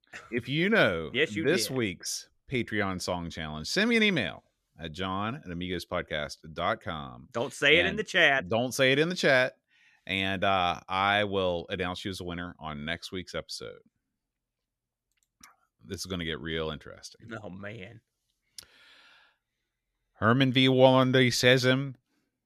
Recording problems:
none

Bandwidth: 13.5 kHz